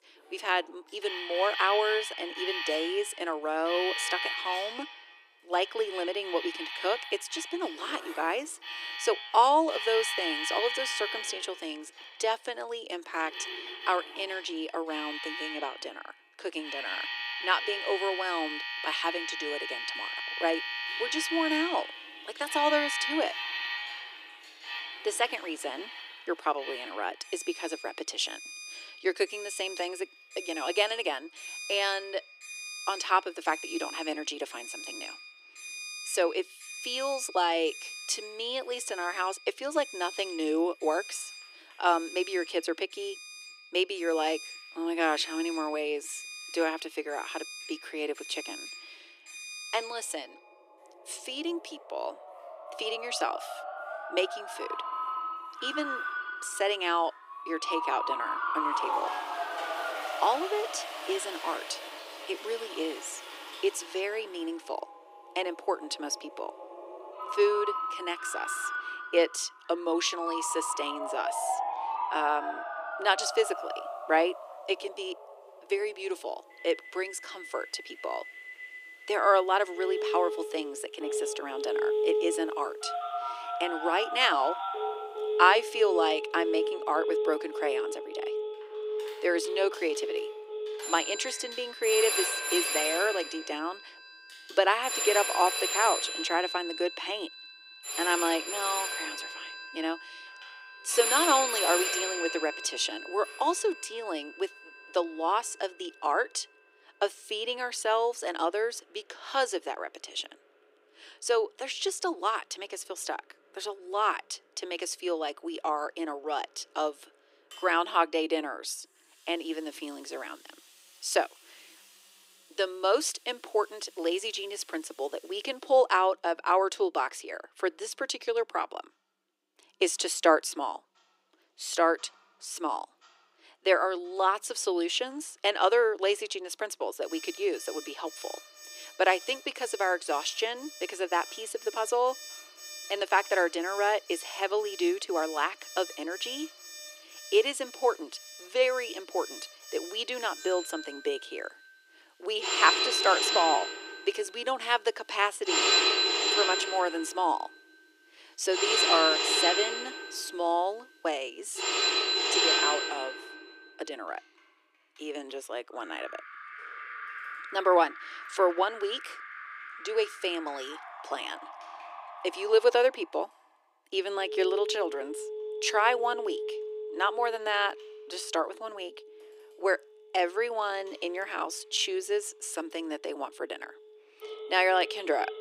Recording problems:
thin; very; fading below 300 Hz
alarms or sirens; loud; throughout; 3 dB below the speech
household noises; noticeable; throughout; 20 dB below the speech

